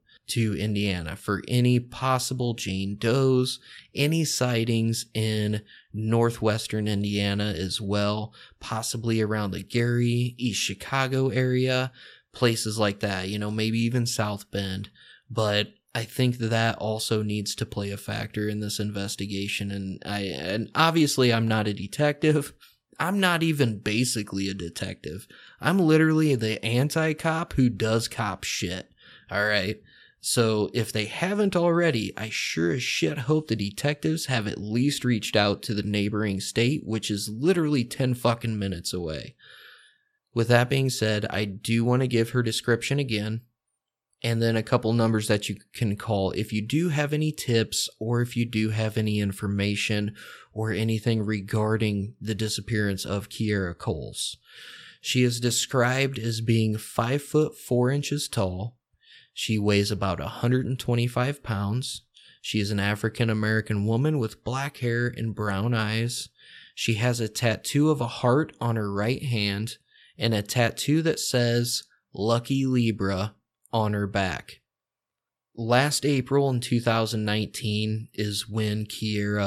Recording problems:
abrupt cut into speech; at the end

